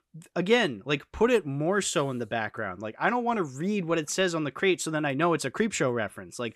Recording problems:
none

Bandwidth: 14 kHz